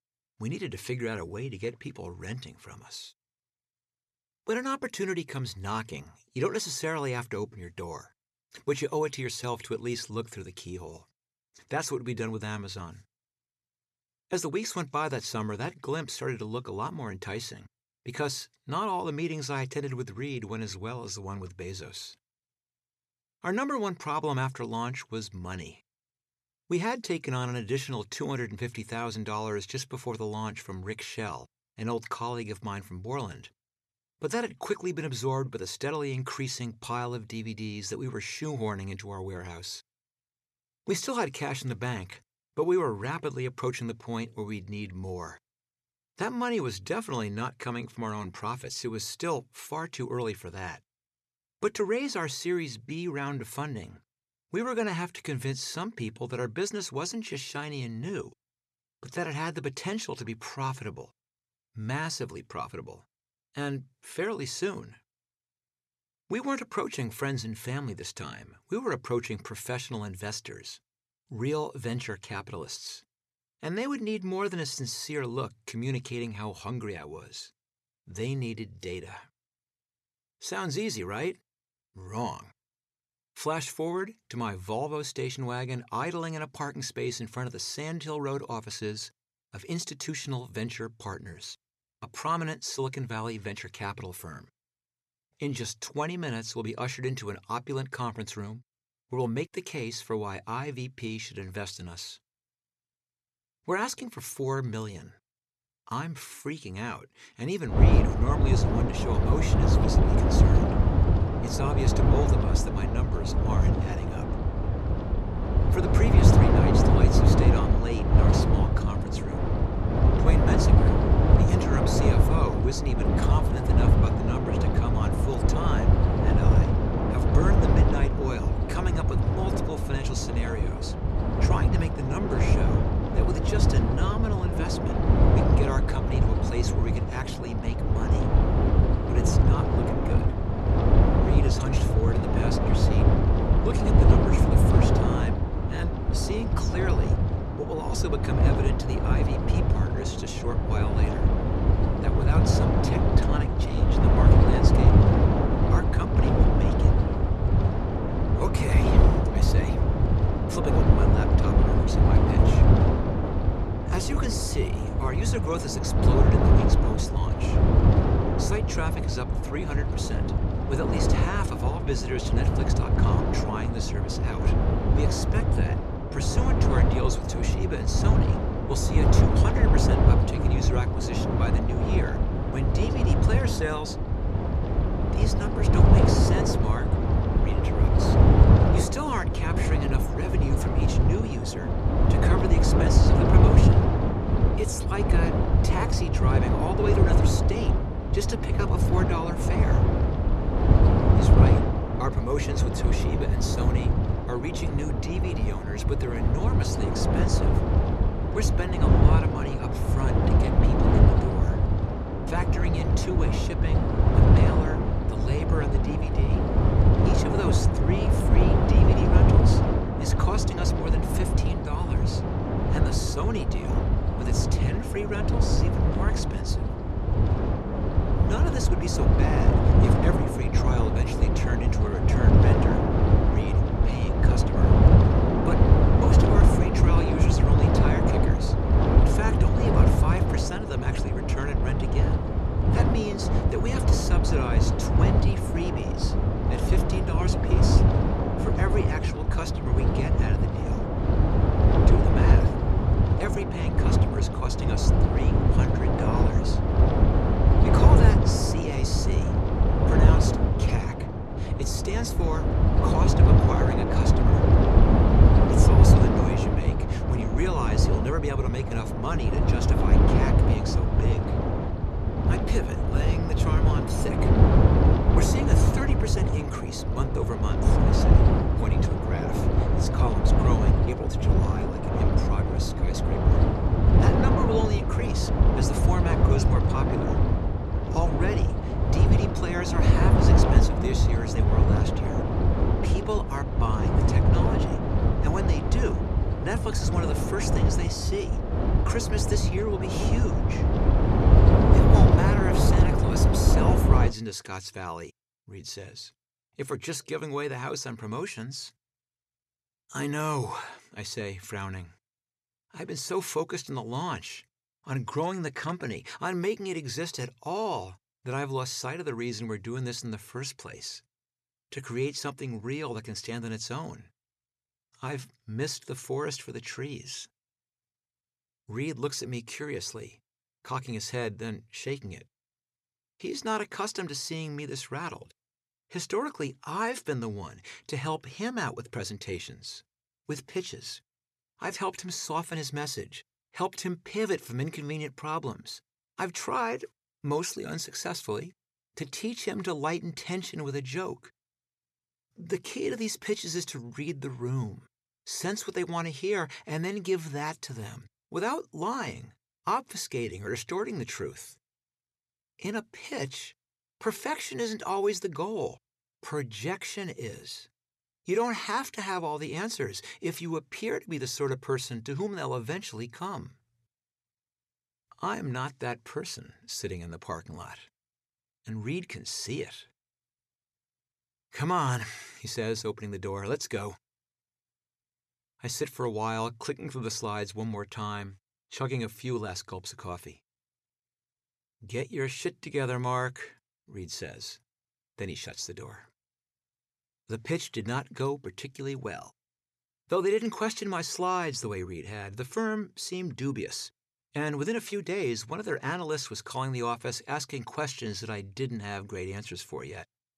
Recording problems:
wind noise on the microphone; heavy; from 1:48 to 5:04; 4 dB above the speech

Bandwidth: 13.5 kHz